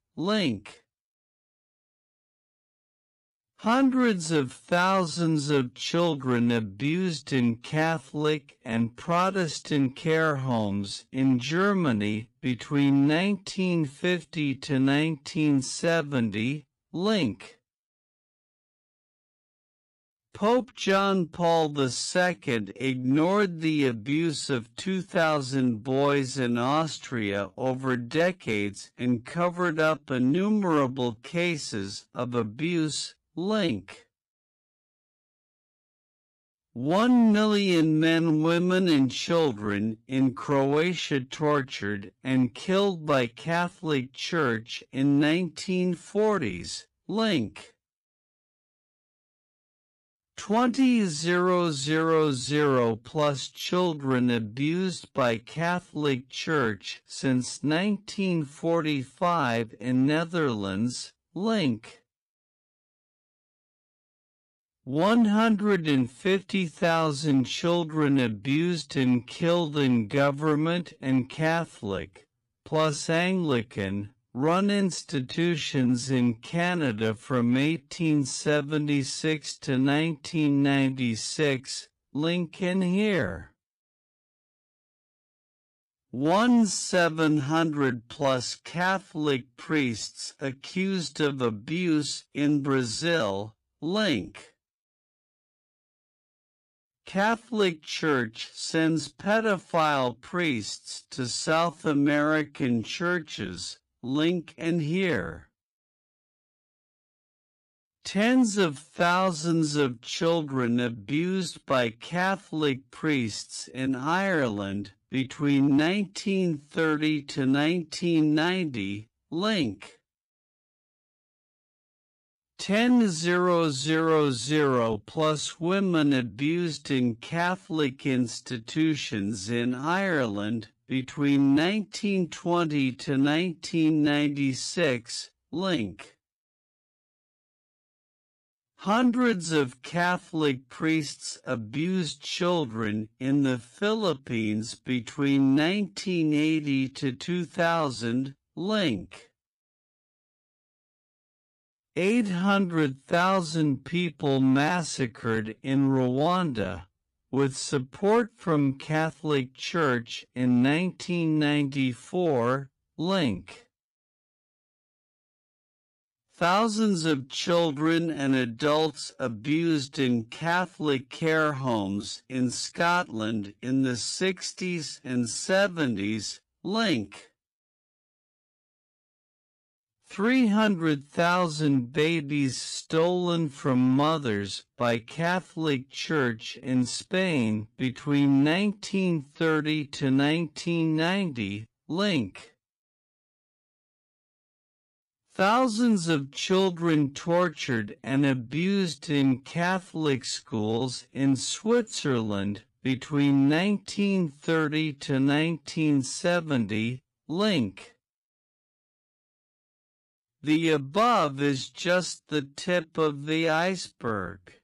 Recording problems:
wrong speed, natural pitch; too slow; 0.5 times normal speed

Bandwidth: 14.5 kHz